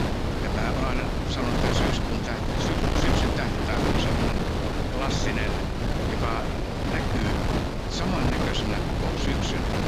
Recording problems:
wind noise on the microphone; heavy; 4 dB above the speech

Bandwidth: 15.5 kHz